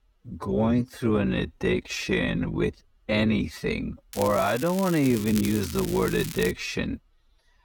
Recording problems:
wrong speed, natural pitch; too slow; 0.6 times normal speed
crackling; noticeable; from 4 to 6.5 s; 10 dB below the speech

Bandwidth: 18.5 kHz